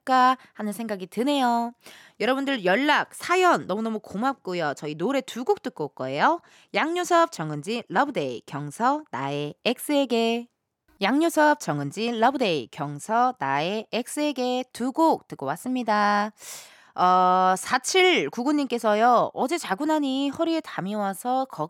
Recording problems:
none

